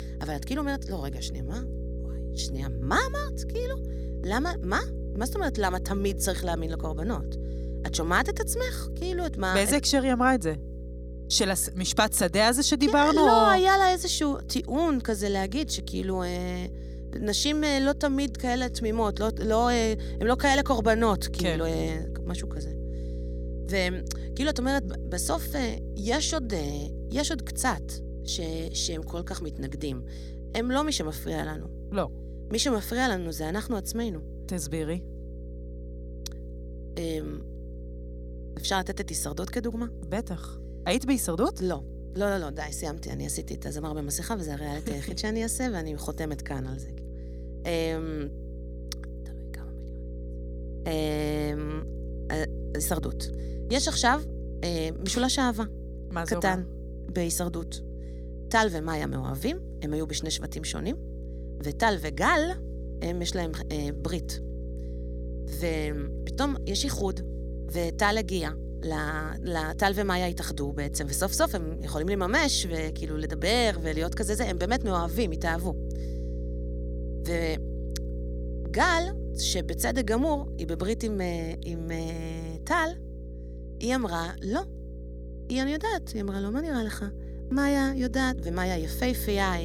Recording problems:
electrical hum; noticeable; throughout; 60 Hz, 20 dB below the speech
abrupt cut into speech; at the end

